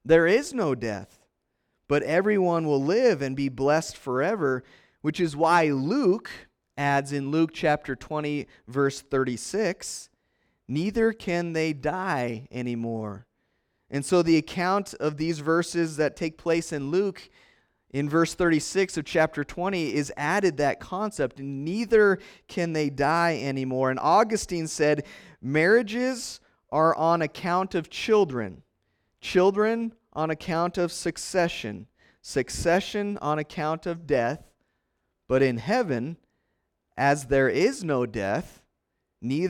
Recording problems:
abrupt cut into speech; at the end

